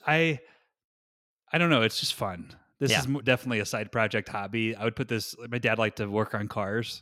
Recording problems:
none

